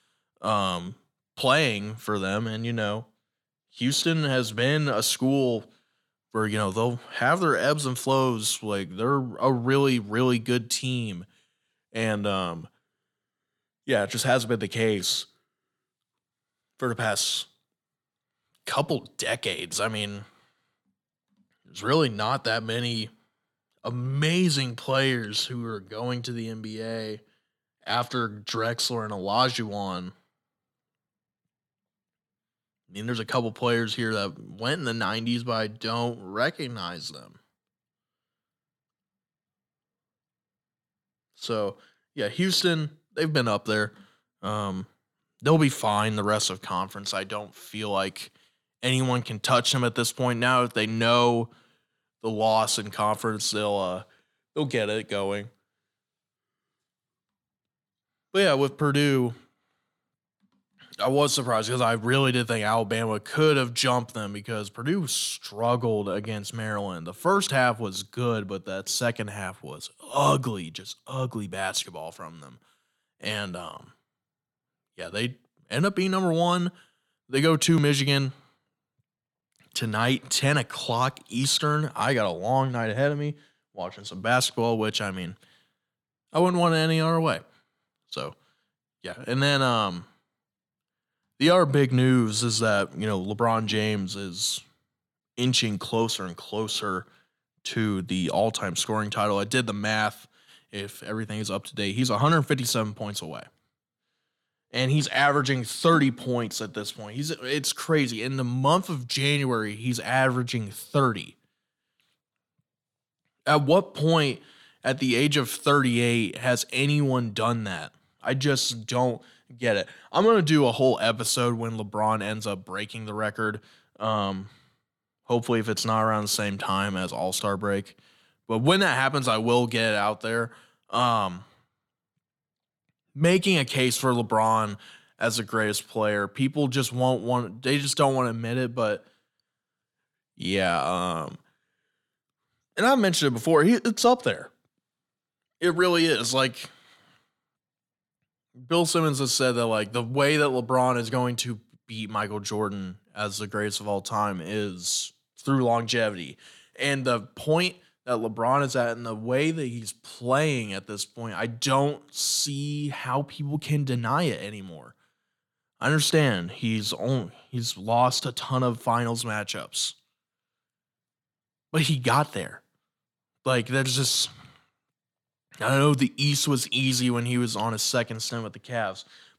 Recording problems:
none

